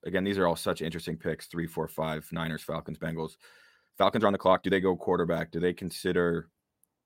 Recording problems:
uneven, jittery; strongly; from 1.5 to 4.5 s

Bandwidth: 16 kHz